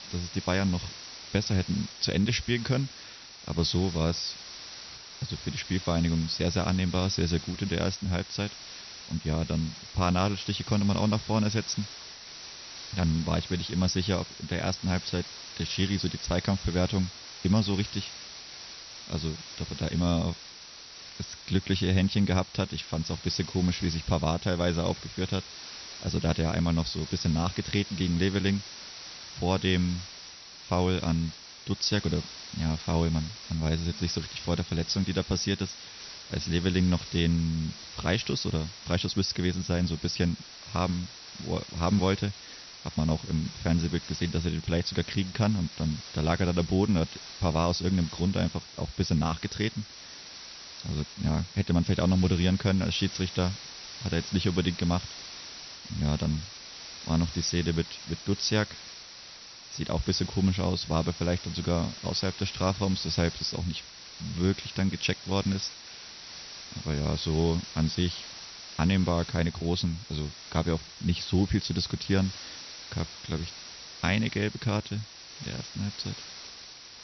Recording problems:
high frequencies cut off; noticeable; nothing above 6 kHz
hiss; noticeable; throughout; 10 dB below the speech

